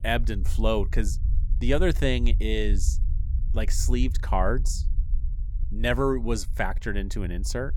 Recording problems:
low rumble; faint; throughout; 20 dB below the speech

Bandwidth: 18 kHz